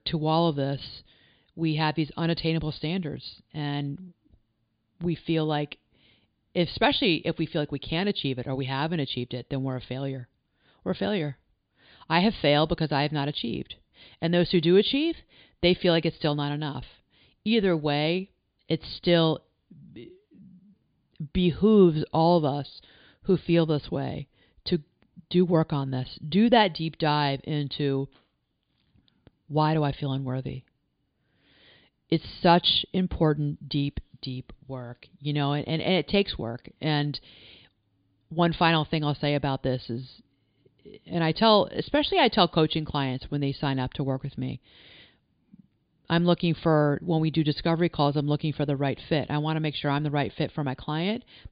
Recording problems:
high frequencies cut off; severe; nothing above 5 kHz

